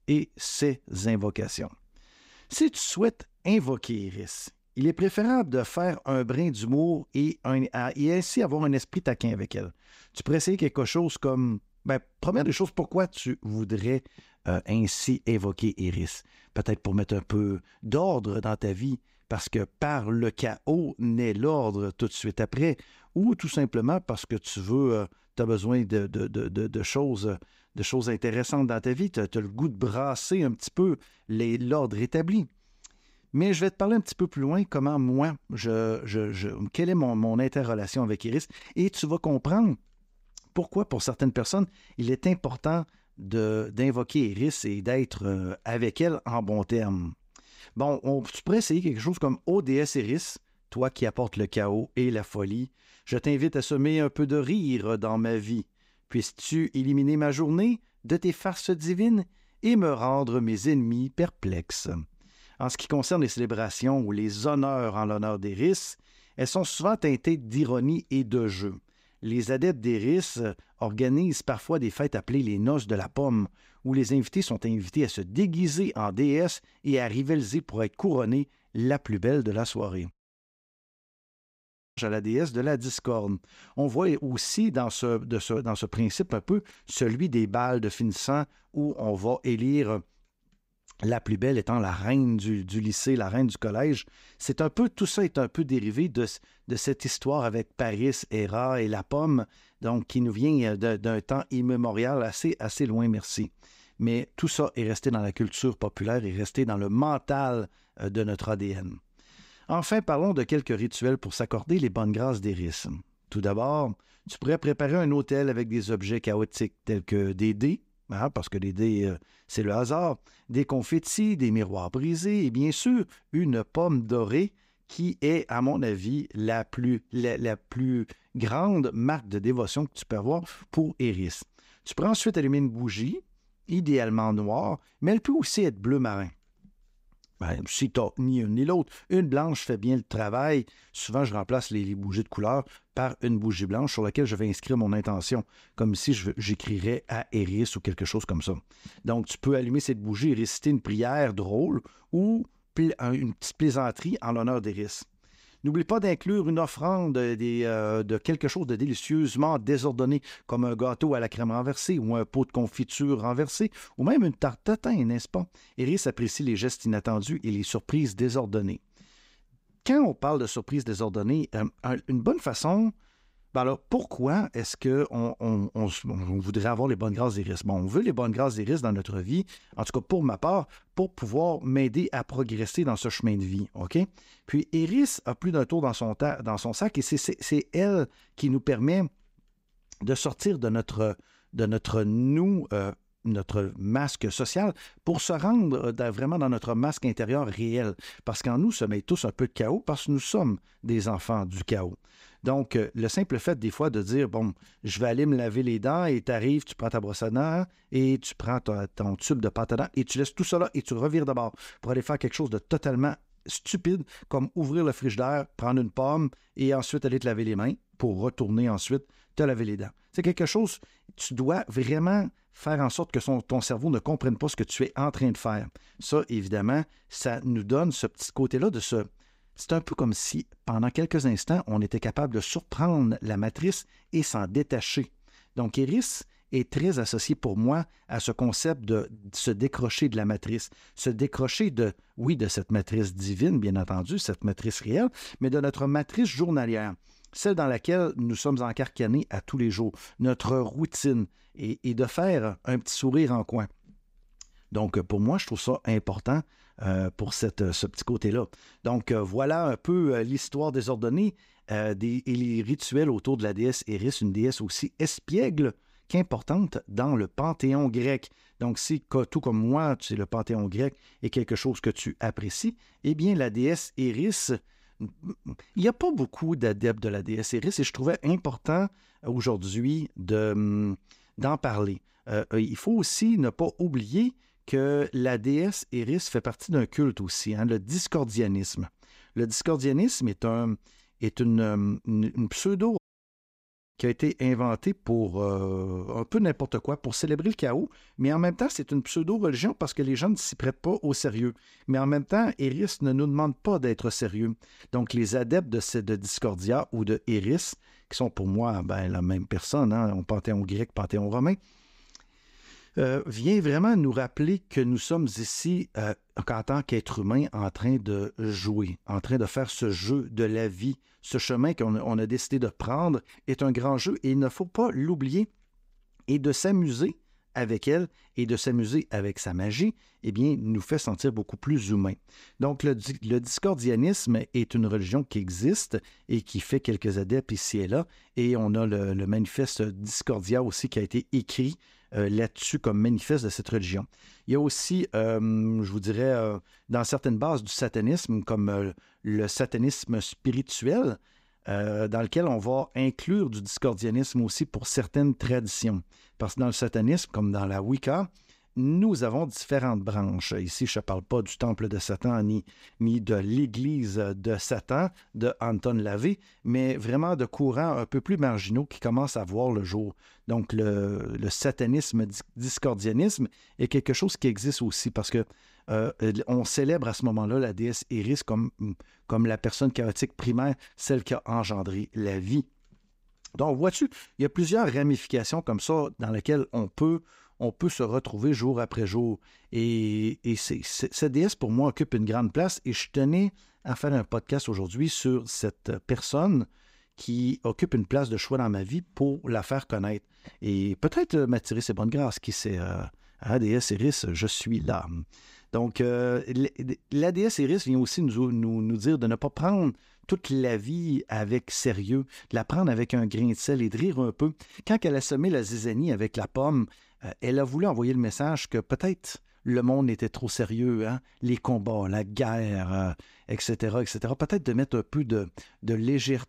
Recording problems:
audio cutting out; at 1:20 for 2 s and at 4:53 for 1 s

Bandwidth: 15.5 kHz